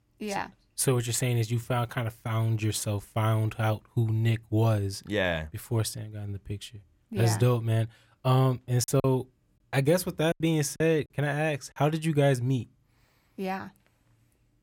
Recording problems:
choppy; very; from 9 to 11 s; 6% of the speech affected

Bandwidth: 16.5 kHz